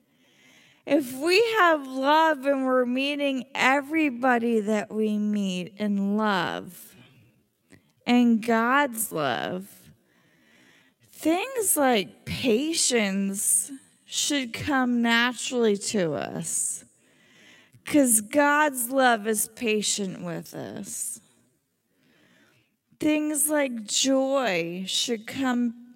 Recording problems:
wrong speed, natural pitch; too slow; 0.5 times normal speed

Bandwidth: 16 kHz